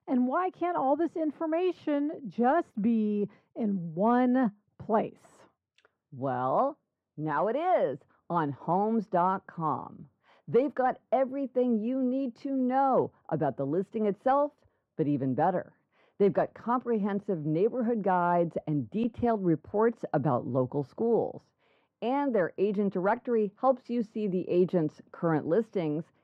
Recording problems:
muffled; very; fading above 3 kHz

